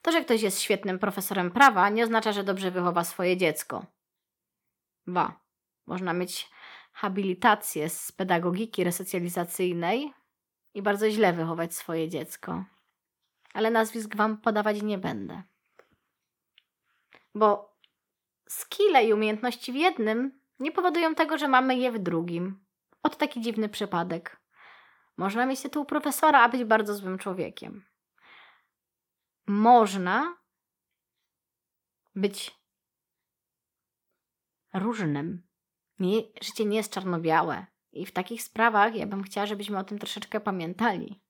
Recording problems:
none

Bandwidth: 18 kHz